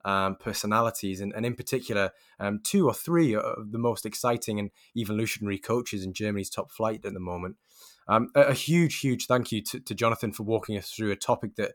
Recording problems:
none

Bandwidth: 18.5 kHz